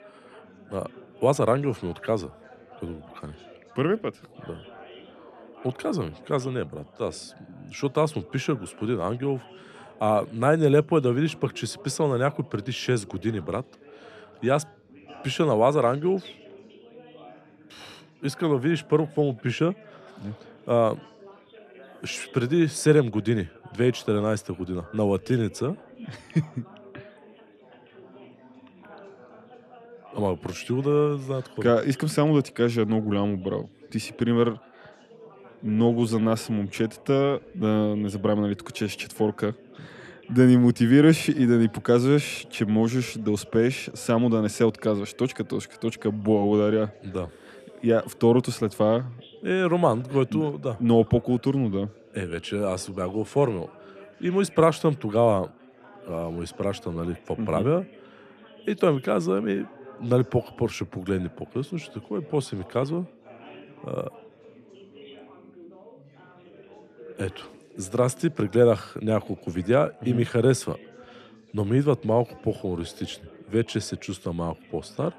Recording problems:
chatter from many people; faint; throughout; 25 dB below the speech

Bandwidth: 13.5 kHz